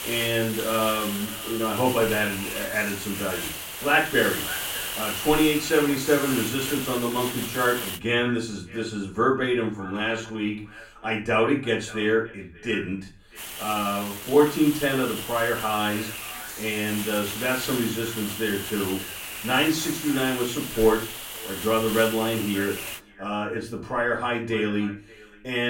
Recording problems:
off-mic speech; far
echo of what is said; faint; throughout; 580 ms later, 20 dB below the speech
room echo; slight; dies away in 0.3 s
hiss; loud; until 8 s and from 13 to 23 s; 6 dB below the speech
uneven, jittery; strongly; from 5 to 14 s
abrupt cut into speech; at the end

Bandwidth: 16.5 kHz